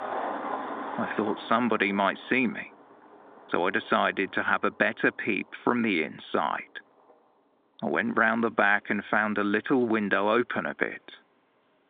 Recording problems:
phone-call audio; nothing above 3.5 kHz
traffic noise; noticeable; throughout; 10 dB below the speech

